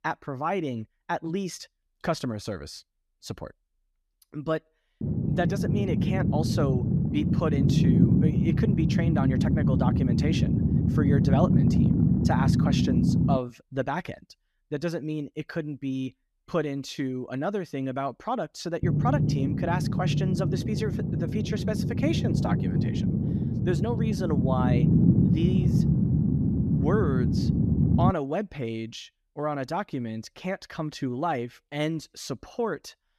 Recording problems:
low rumble; loud; from 5 to 13 s and from 19 to 28 s; 1 dB below the speech

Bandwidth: 14 kHz